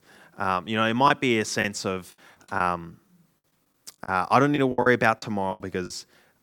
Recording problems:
choppy; very; 10% of the speech affected

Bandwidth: 18 kHz